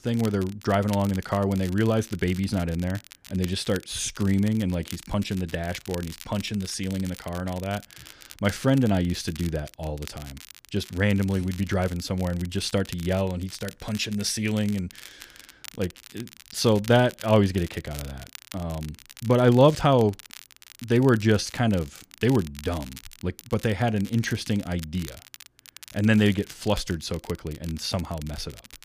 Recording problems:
crackle, like an old record; noticeable; 20 dB below the speech

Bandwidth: 15 kHz